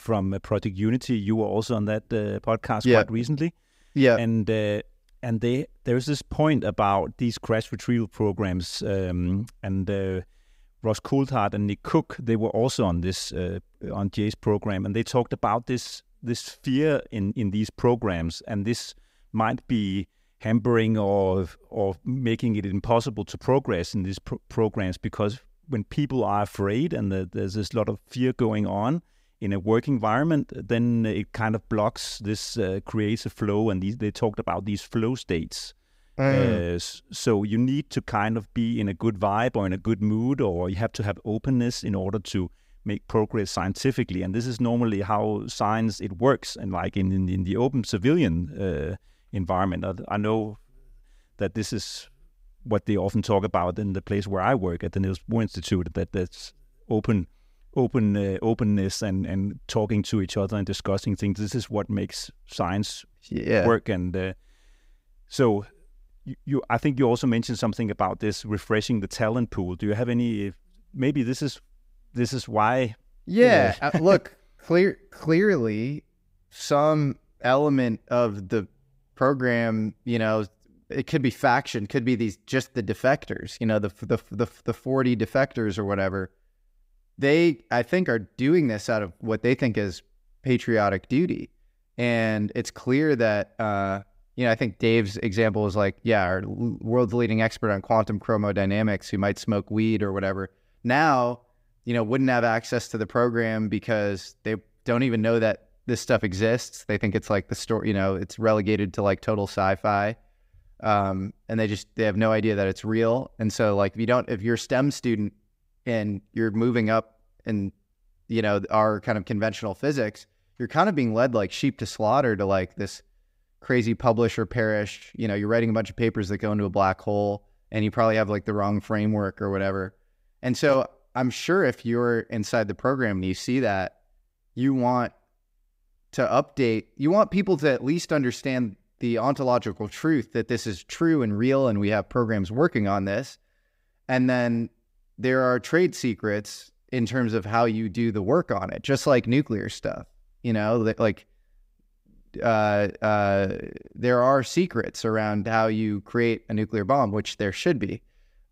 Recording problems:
none

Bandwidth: 15.5 kHz